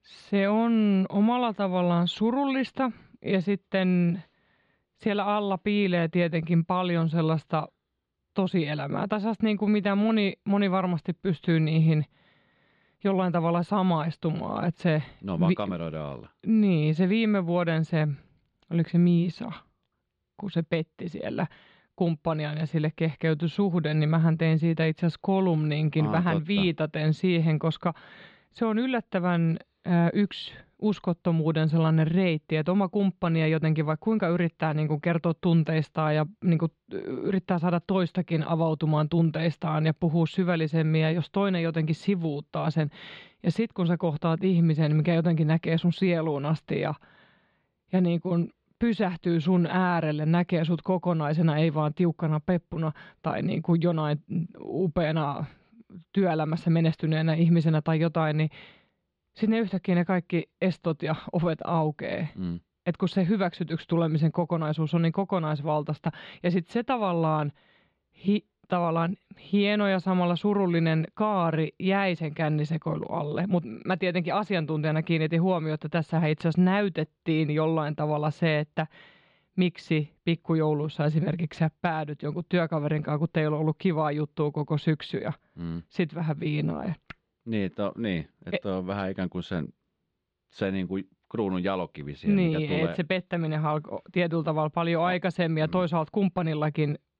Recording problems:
muffled; very slightly; fading above 4 kHz

